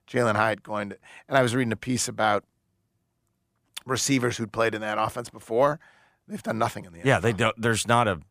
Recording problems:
none

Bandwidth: 15 kHz